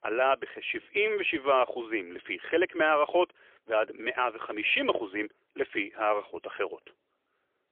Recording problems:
phone-call audio; poor line

